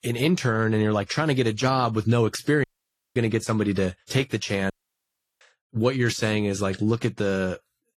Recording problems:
garbled, watery; slightly; nothing above 14 kHz
audio cutting out; at 2.5 s for 0.5 s and at 4.5 s for 0.5 s

